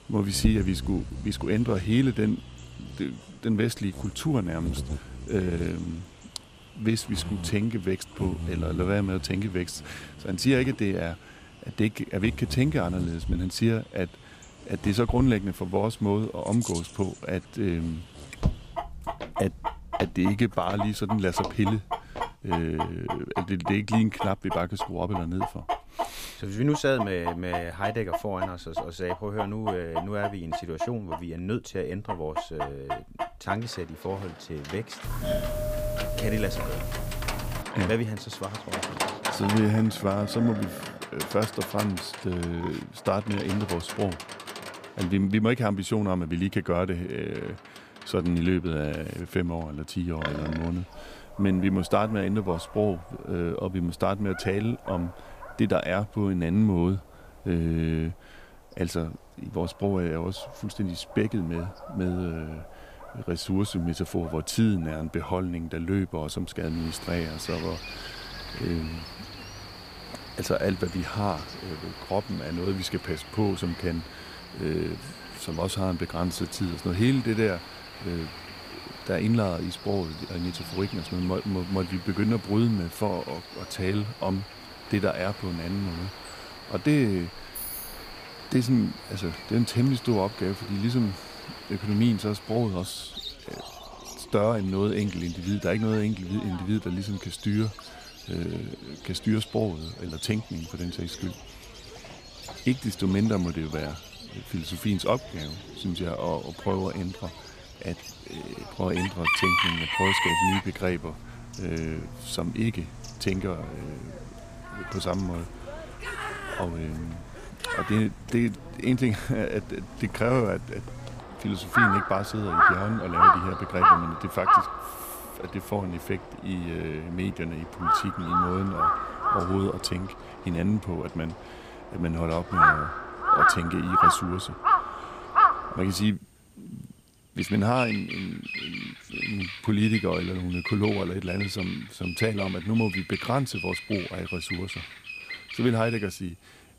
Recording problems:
animal sounds; loud; throughout; 2 dB below the speech
footsteps; noticeable; from 18 to 22 s; peak 8 dB below the speech
doorbell; noticeable; from 35 to 38 s; peak 1 dB below the speech
jangling keys; noticeable; at 1:27; peak 5 dB below the speech

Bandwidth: 15 kHz